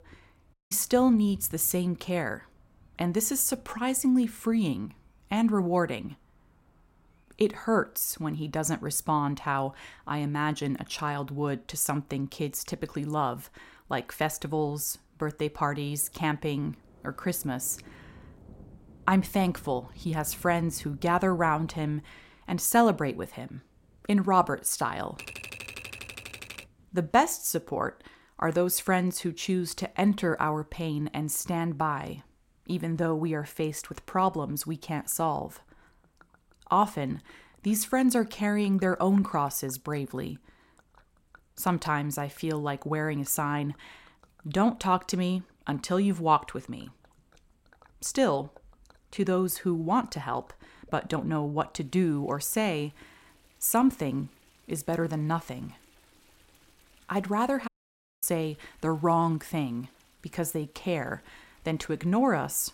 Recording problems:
rain or running water; faint; throughout; 30 dB below the speech
audio cutting out; at 0.5 s and at 58 s for 0.5 s
keyboard typing; faint; from 25 to 27 s; peak 10 dB below the speech

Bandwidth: 16 kHz